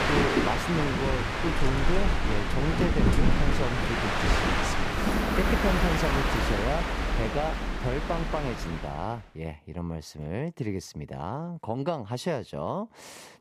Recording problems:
train or aircraft noise; very loud; until 9 s; 5 dB above the speech

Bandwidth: 14.5 kHz